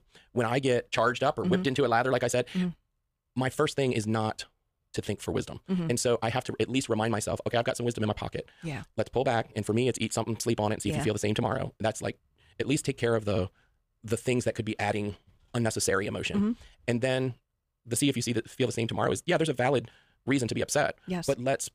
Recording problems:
wrong speed, natural pitch; too fast; 1.8 times normal speed

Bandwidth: 15 kHz